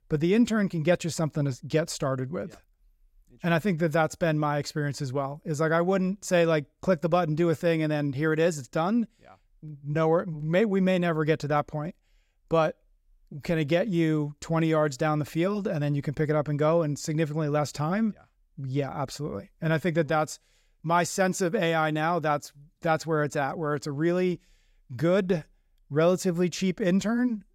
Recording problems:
none

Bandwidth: 16.5 kHz